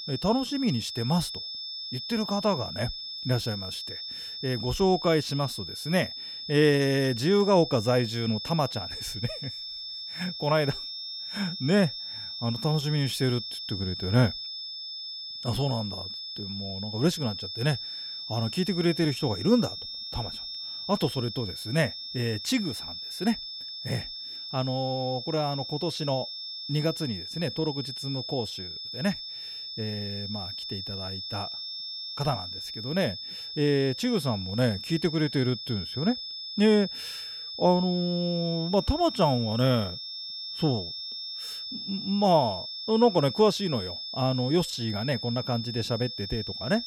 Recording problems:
high-pitched whine; loud; throughout; 5 kHz, 7 dB below the speech

